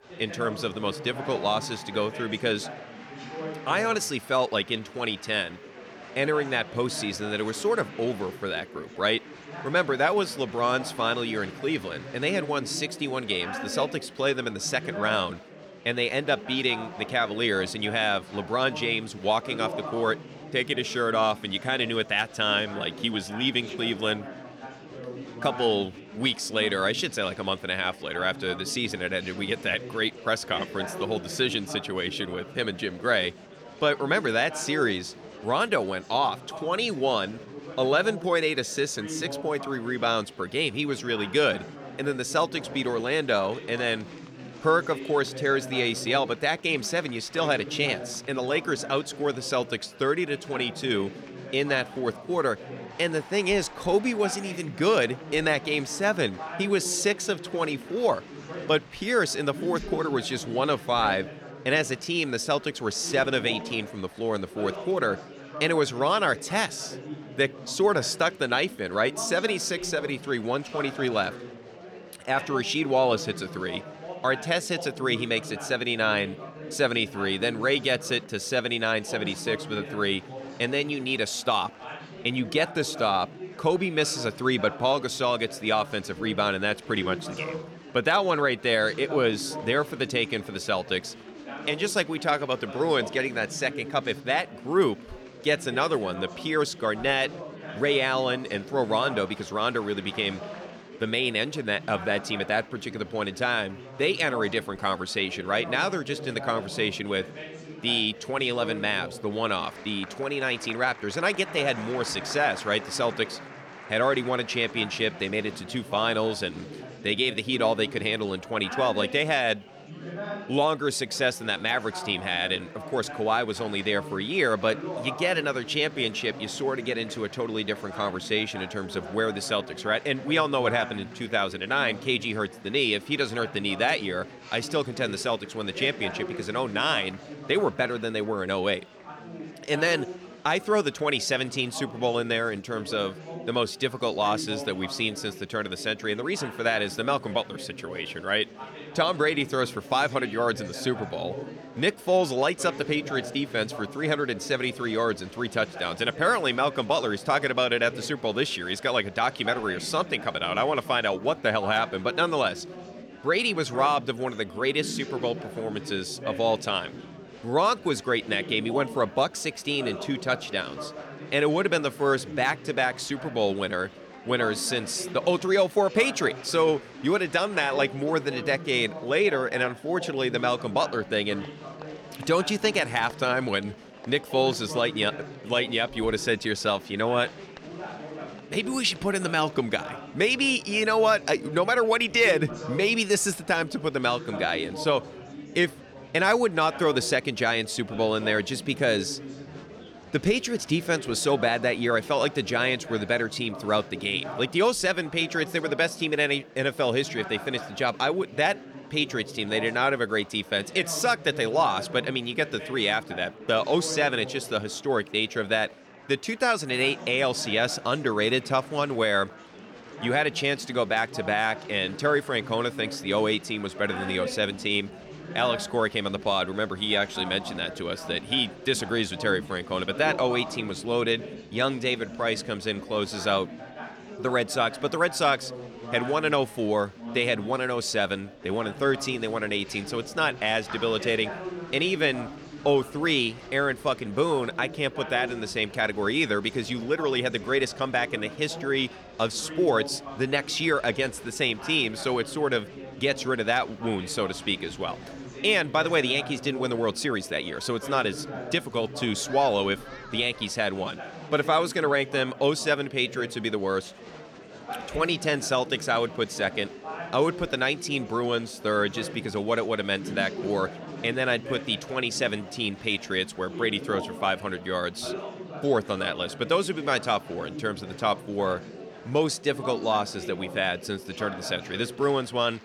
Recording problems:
chatter from many people; noticeable; throughout; 15 dB below the speech

